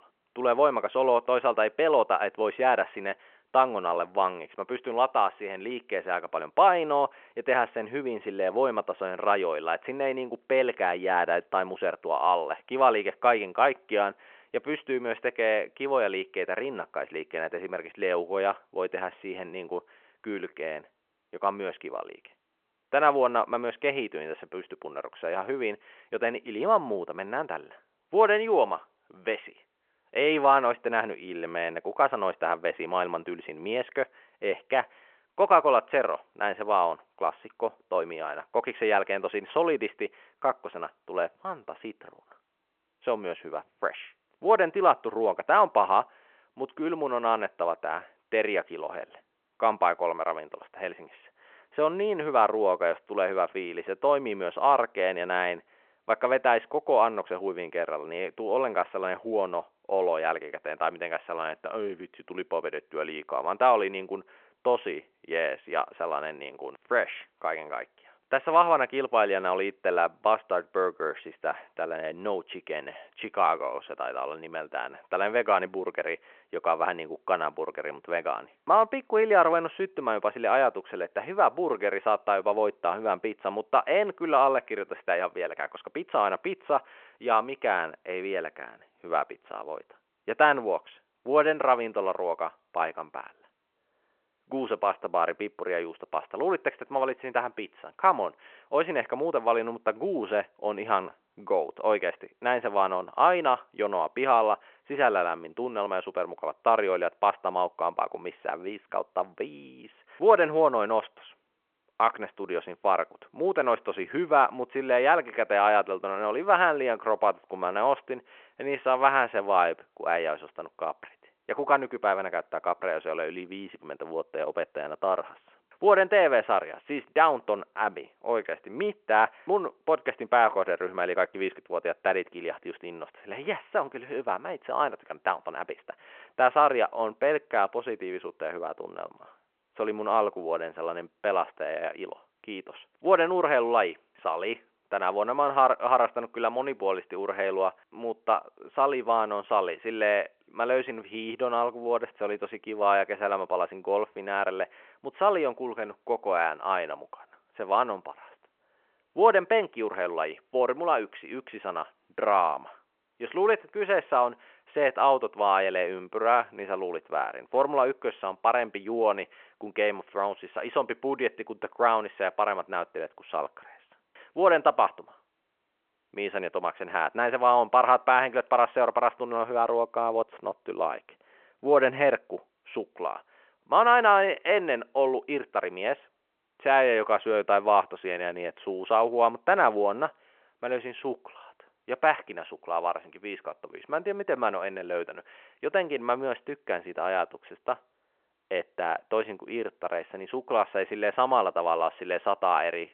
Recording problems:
phone-call audio

